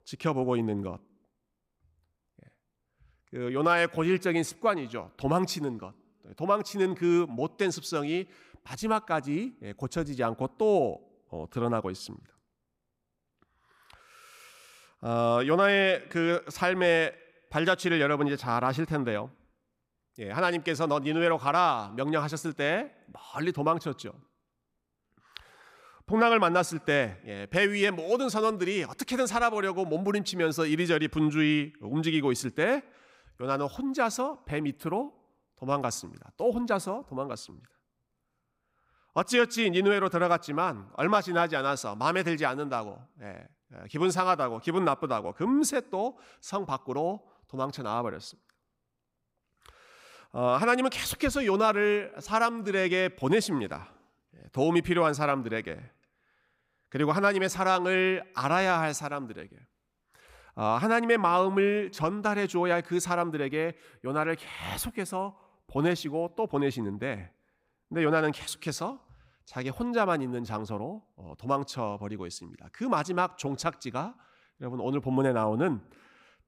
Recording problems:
none

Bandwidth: 15.5 kHz